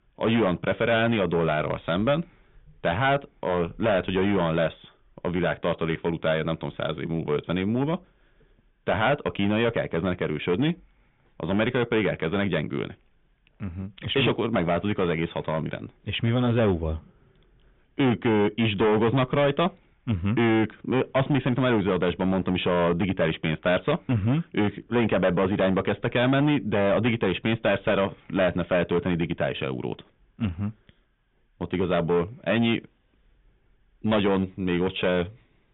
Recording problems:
distortion; heavy; 10% of the sound clipped
high frequencies cut off; severe; nothing above 3.5 kHz

